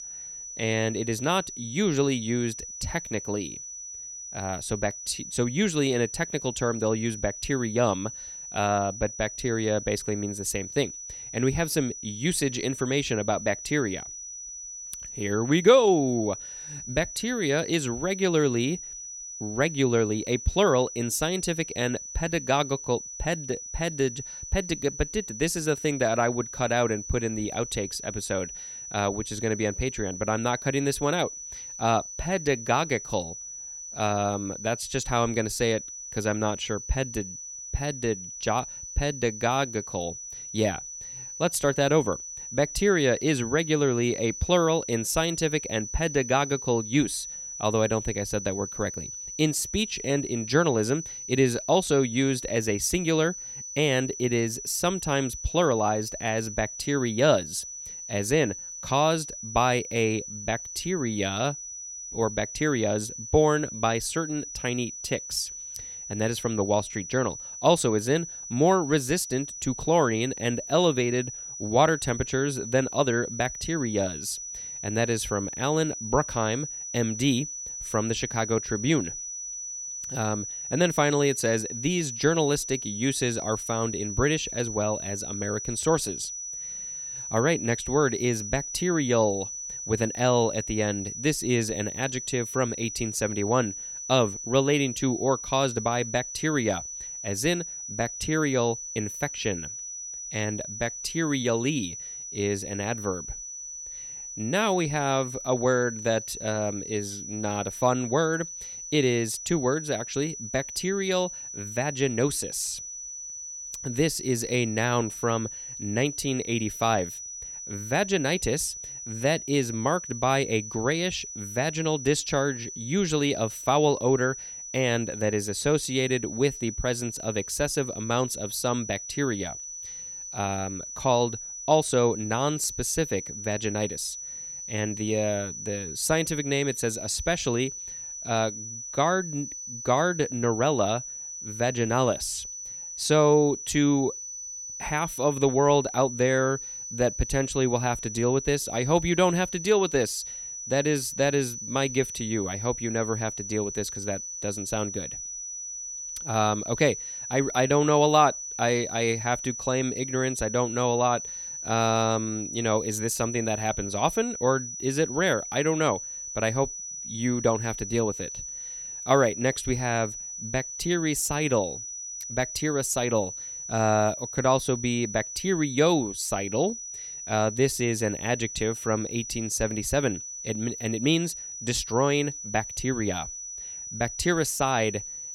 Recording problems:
high-pitched whine; loud; throughout; 6 kHz, 8 dB below the speech

